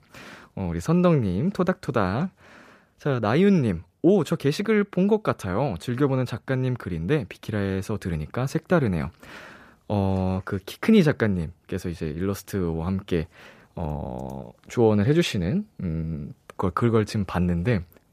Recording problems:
none

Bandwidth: 14.5 kHz